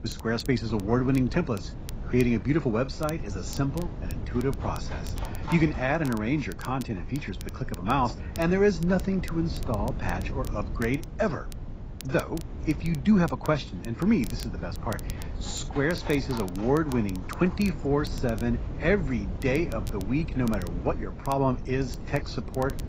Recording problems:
garbled, watery; badly; nothing above 7.5 kHz
animal sounds; noticeable; throughout; 20 dB below the speech
wind noise on the microphone; occasional gusts; 15 dB below the speech
crackle, like an old record; faint; 20 dB below the speech
rain or running water; very faint; throughout; 20 dB below the speech

